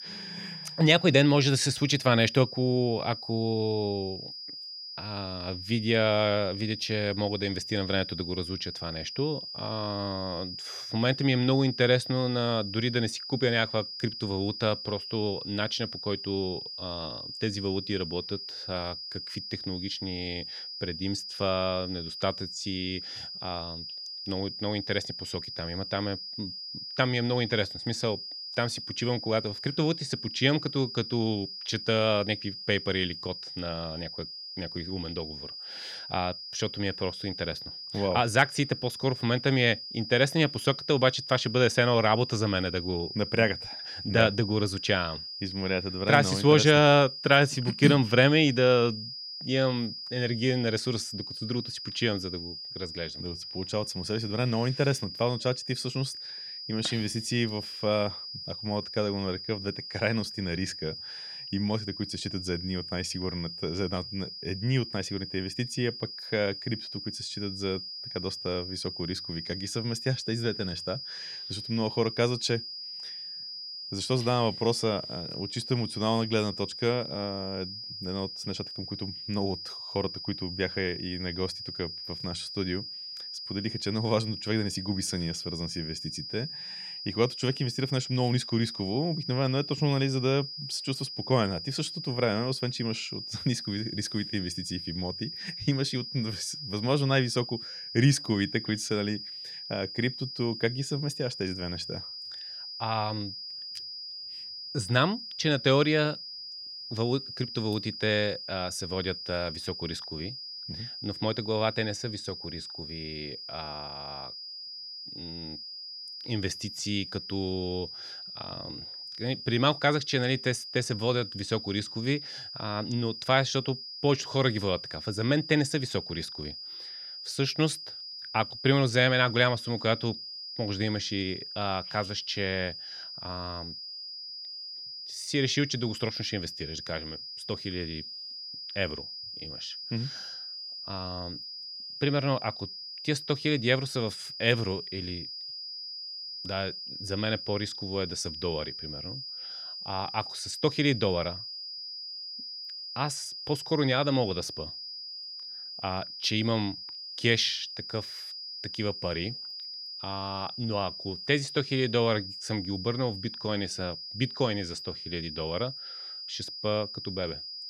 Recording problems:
high-pitched whine; loud; throughout; 5 kHz, 8 dB below the speech

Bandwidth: 18 kHz